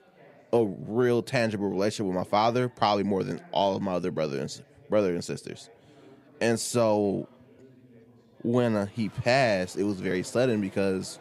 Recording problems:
chatter from many people; faint; throughout; 25 dB below the speech

